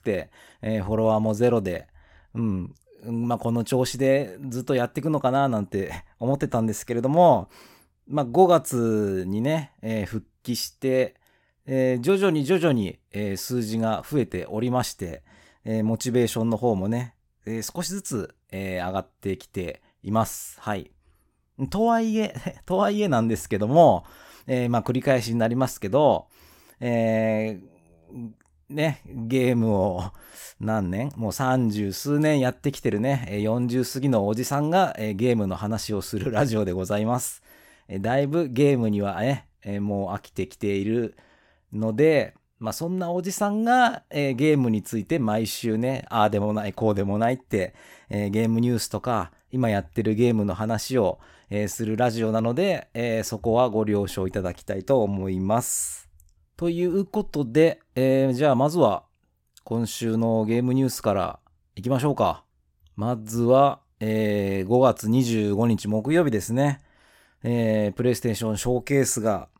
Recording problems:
none

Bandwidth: 16.5 kHz